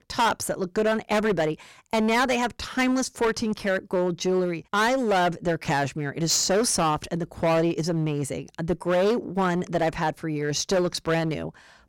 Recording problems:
distortion; heavy; 12% of the sound clipped

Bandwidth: 16.5 kHz